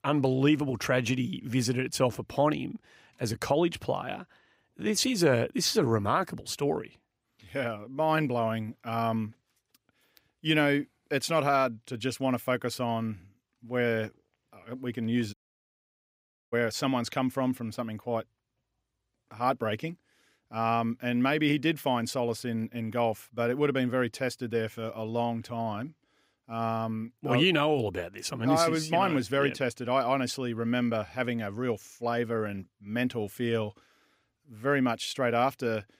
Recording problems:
audio cutting out; at 15 s for 1 s

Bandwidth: 15.5 kHz